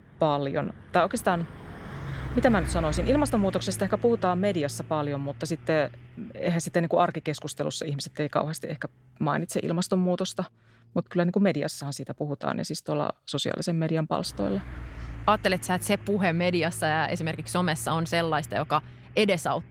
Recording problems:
garbled, watery; slightly; nothing above 18.5 kHz
traffic noise; noticeable; throughout; 15 dB below the speech

